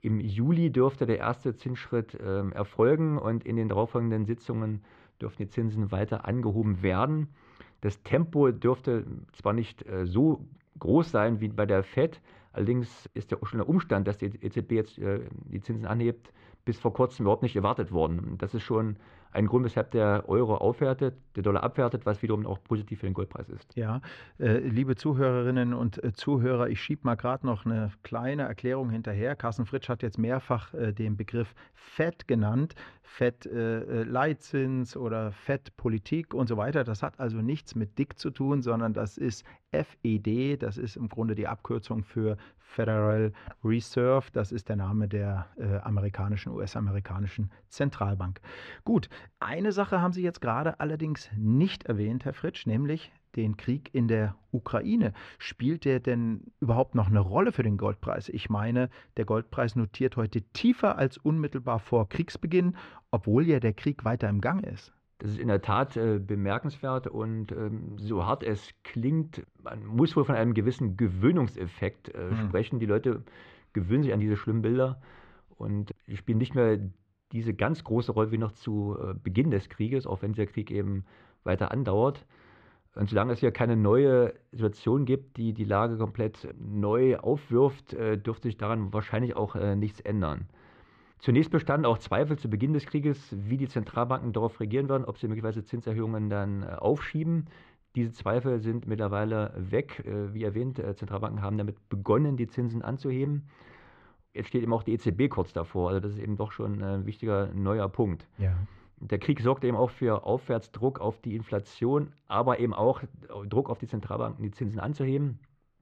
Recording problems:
muffled; slightly; fading above 2.5 kHz

